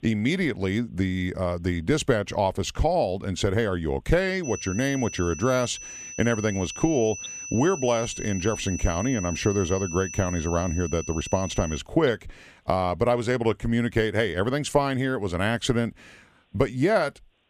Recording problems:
high-pitched whine; loud; from 4.5 to 12 s; 6 kHz, 10 dB below the speech

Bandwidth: 15 kHz